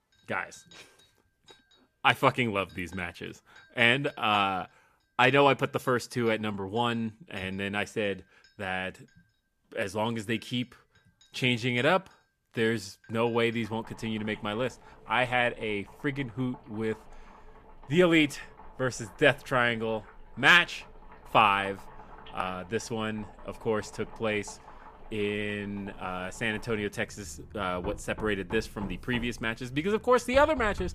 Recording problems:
household noises; faint; throughout; 20 dB below the speech

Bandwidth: 14.5 kHz